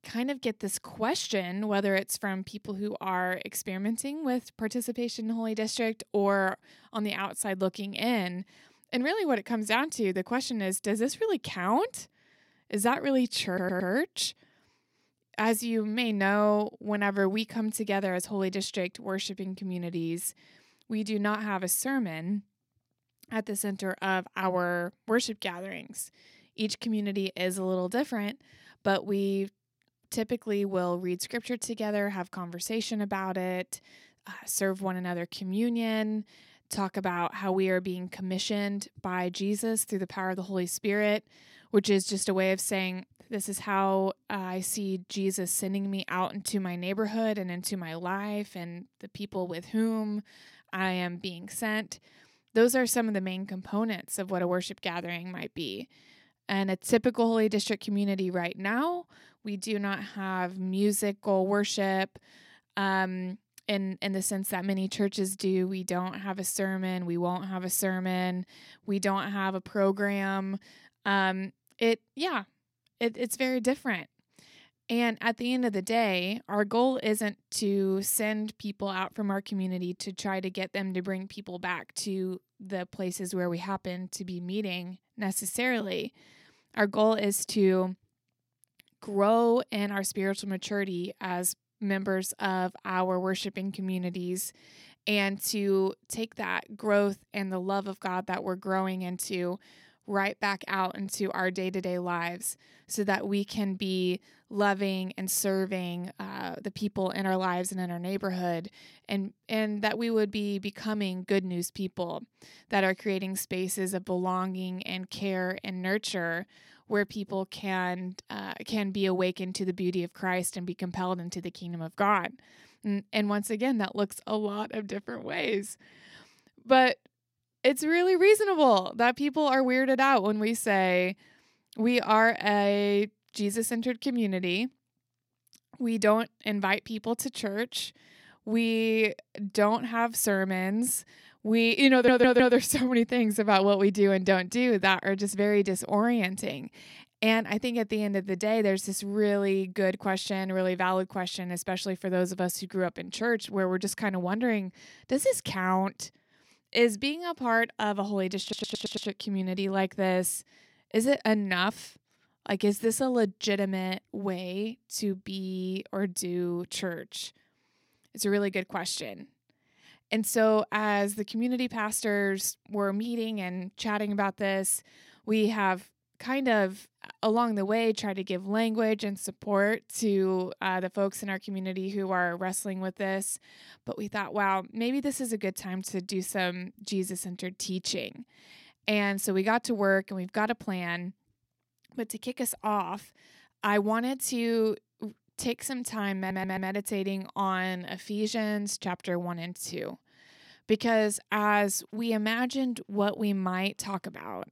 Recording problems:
audio stuttering; 4 times, first at 13 s

